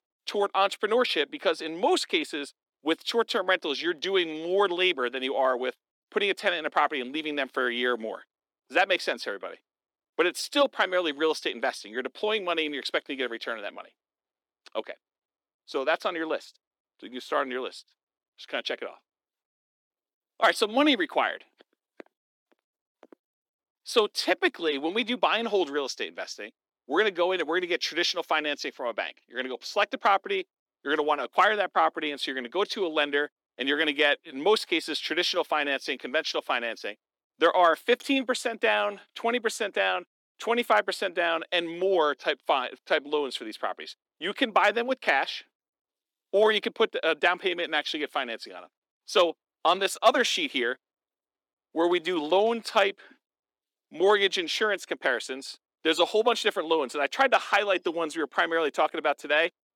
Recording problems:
thin; somewhat; fading below 300 Hz

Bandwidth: 18 kHz